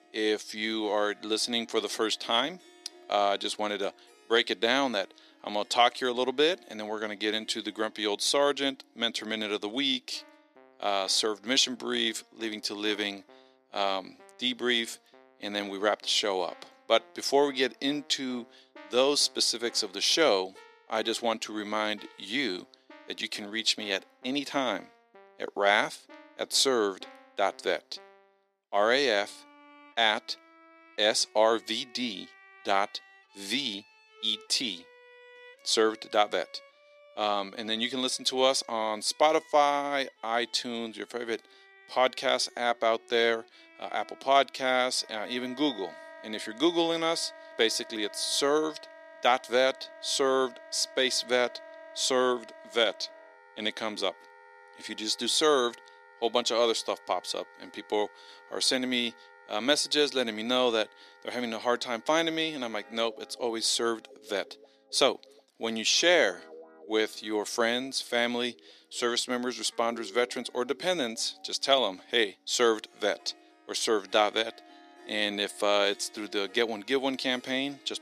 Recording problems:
thin; somewhat; fading below 300 Hz
background music; faint; throughout; 25 dB below the speech

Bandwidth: 14 kHz